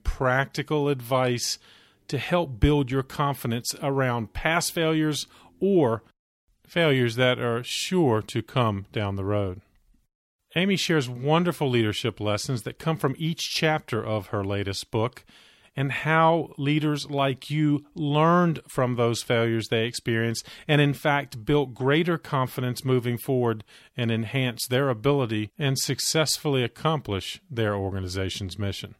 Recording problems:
none

